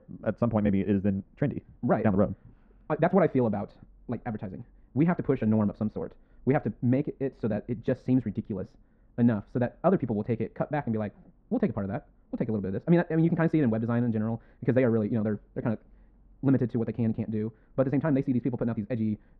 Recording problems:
muffled; very; fading above 1 kHz
wrong speed, natural pitch; too fast; 1.7 times normal speed

